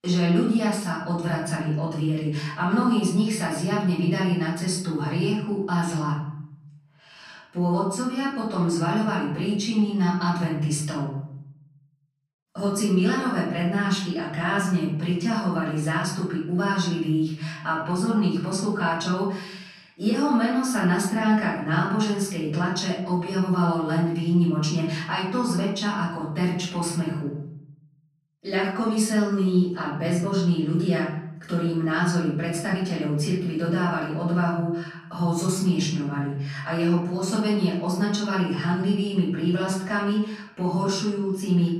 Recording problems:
off-mic speech; far
room echo; noticeable; dies away in 0.7 s

